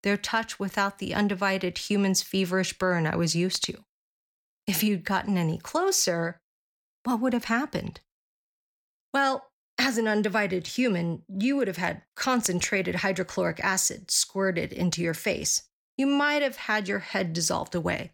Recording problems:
none

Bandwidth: 18.5 kHz